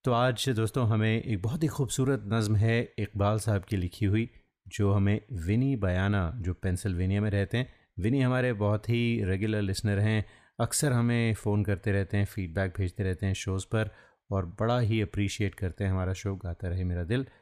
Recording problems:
none

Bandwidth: 15 kHz